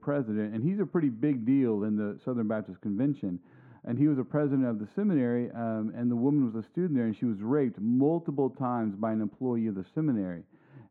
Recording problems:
muffled; very; fading above 3 kHz

